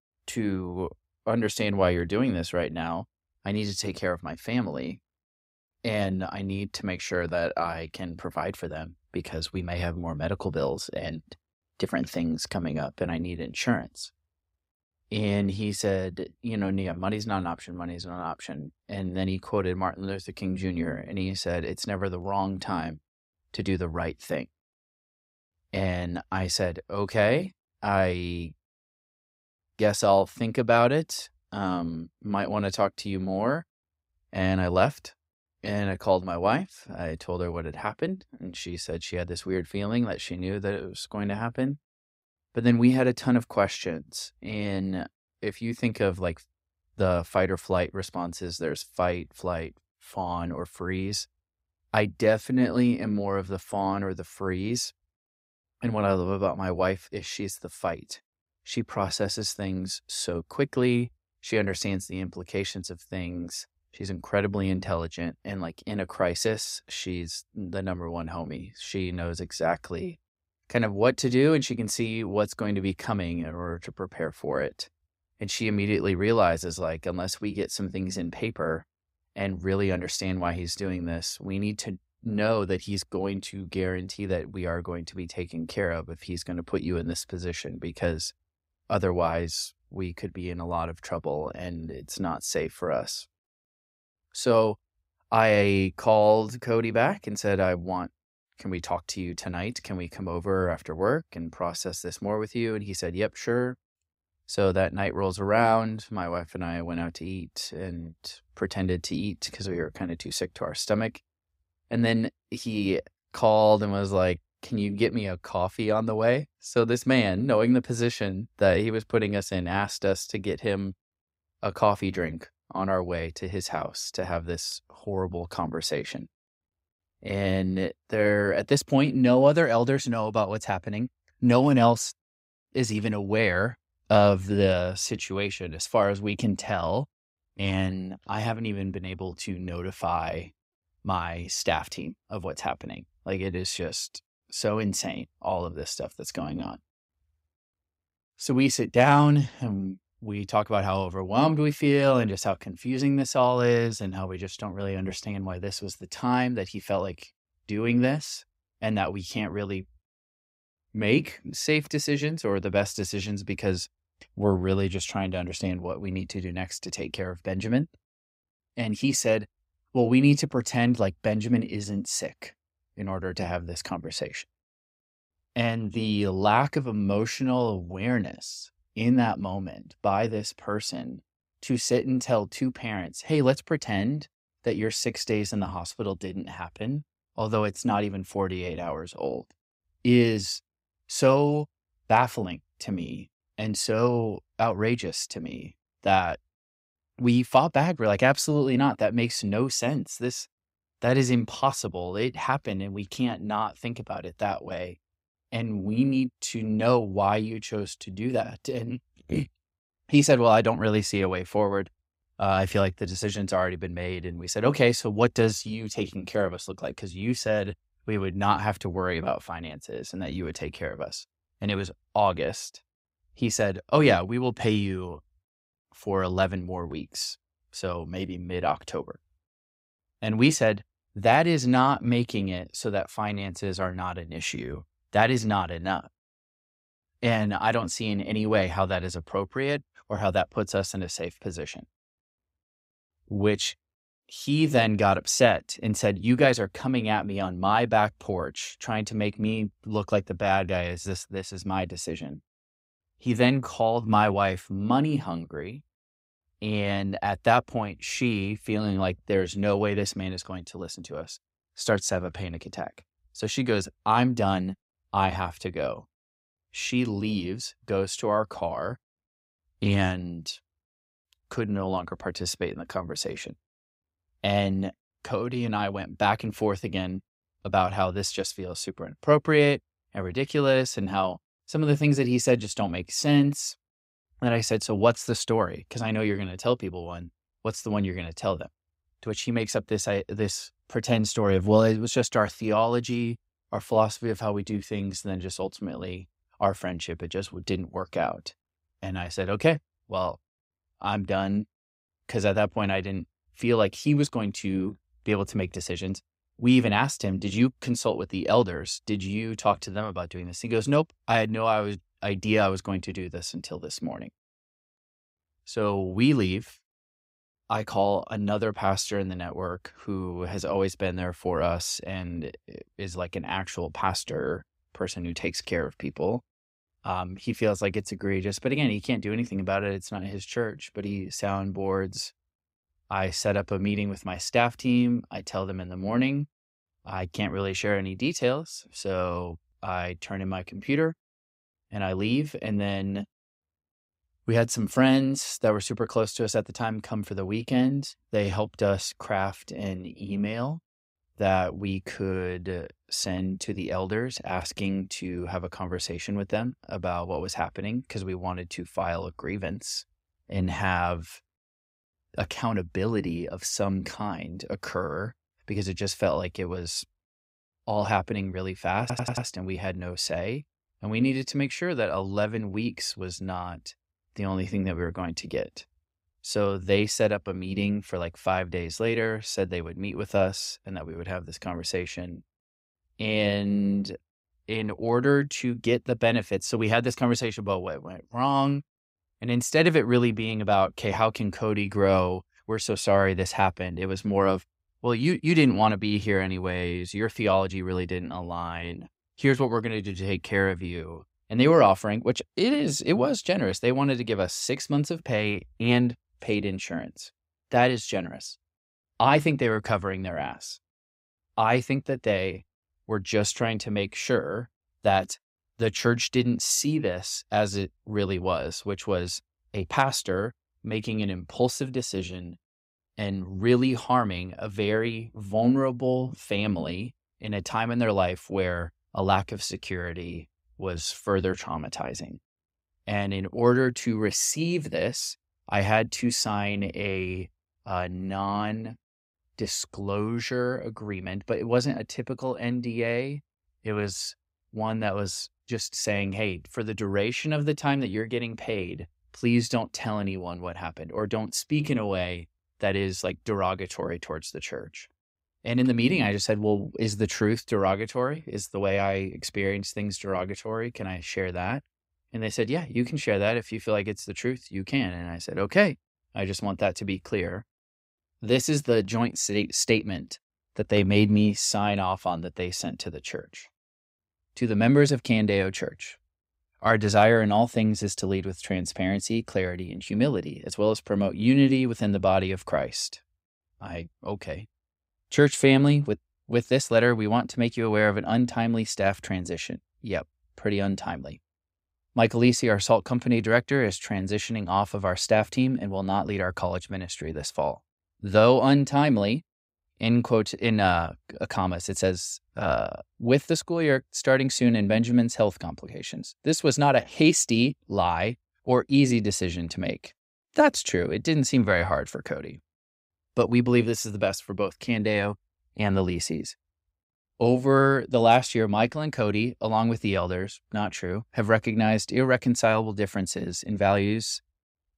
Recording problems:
audio stuttering; at 6:09

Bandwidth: 15.5 kHz